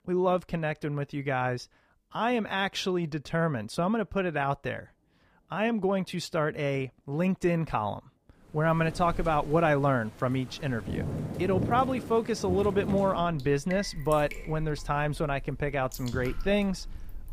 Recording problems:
rain or running water; noticeable; from 8.5 s on; 10 dB below the speech

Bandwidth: 15 kHz